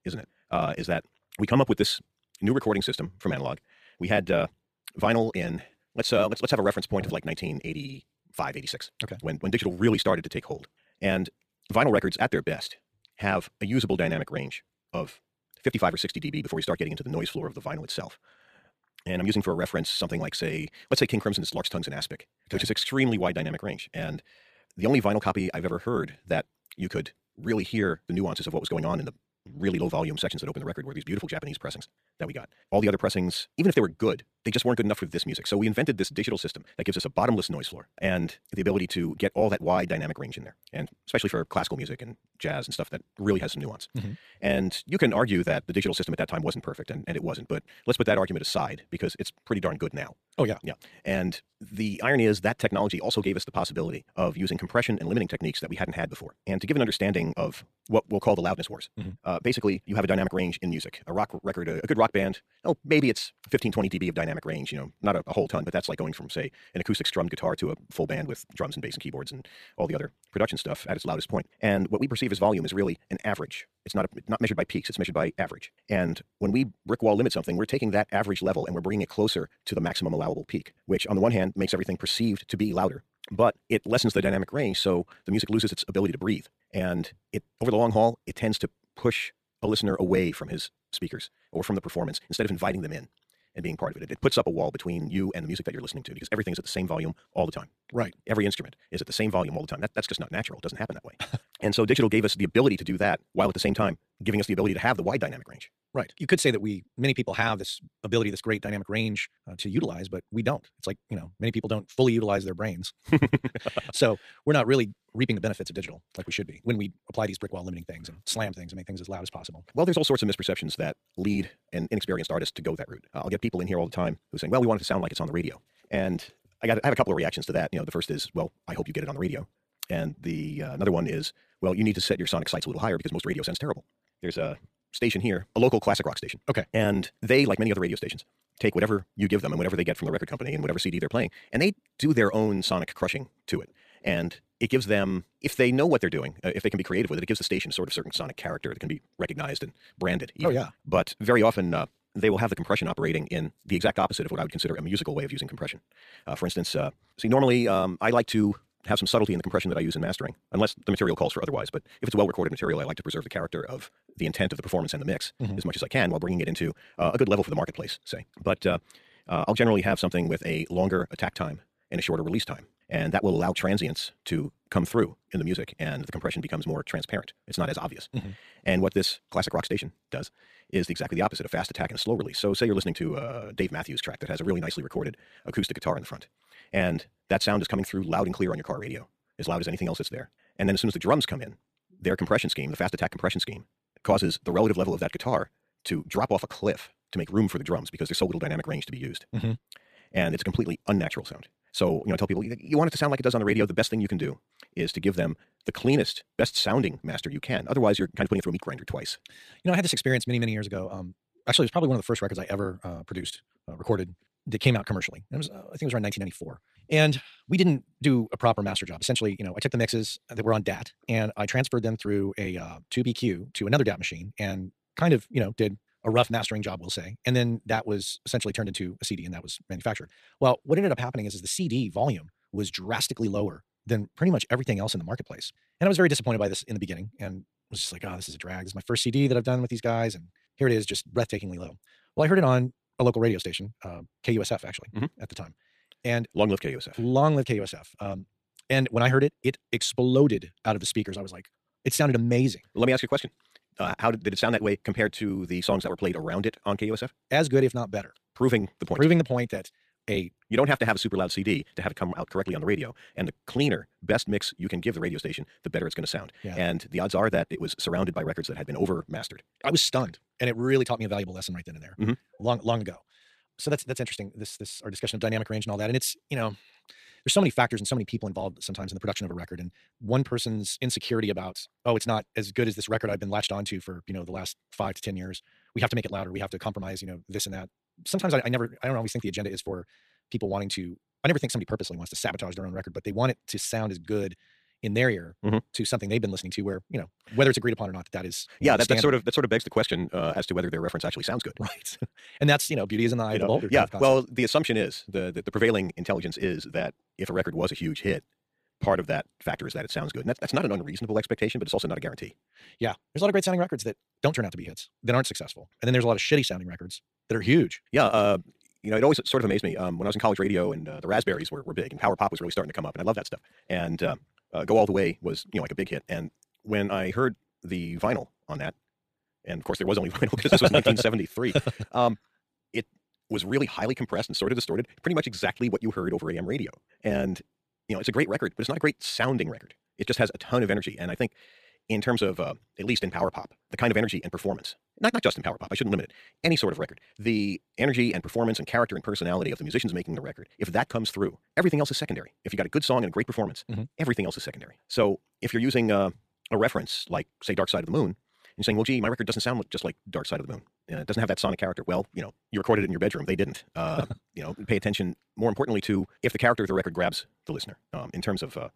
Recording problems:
wrong speed, natural pitch; too fast; 1.8 times normal speed
uneven, jittery; strongly; from 1:05 to 5:51

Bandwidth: 14.5 kHz